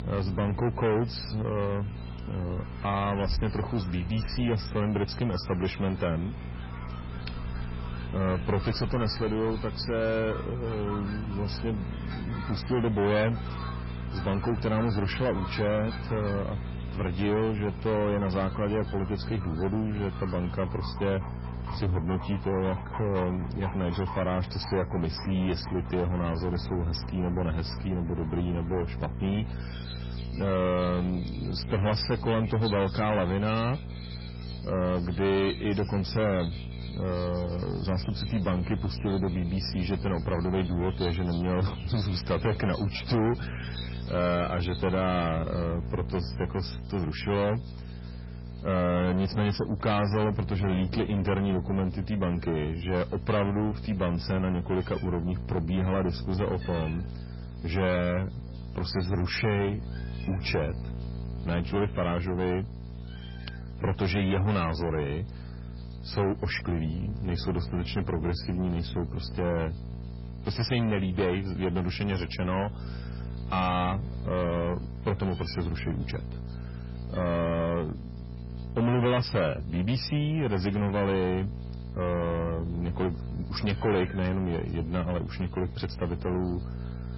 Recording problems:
distortion; heavy; 6 dB below the speech
garbled, watery; badly; nothing above 5.5 kHz
electrical hum; noticeable; throughout; 60 Hz, 15 dB below the speech
animal sounds; noticeable; throughout; 15 dB below the speech

